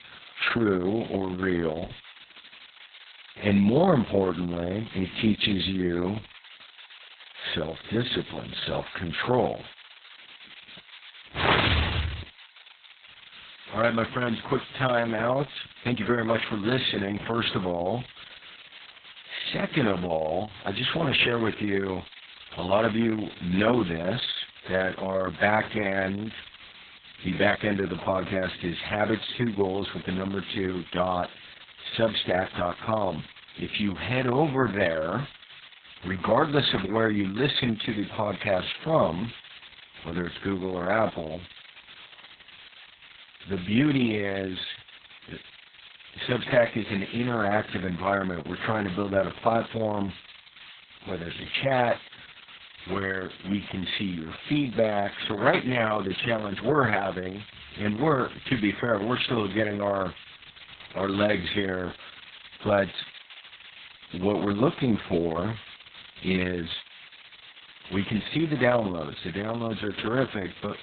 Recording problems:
garbled, watery; badly; nothing above 4 kHz
hiss; noticeable; throughout; 20 dB below the speech

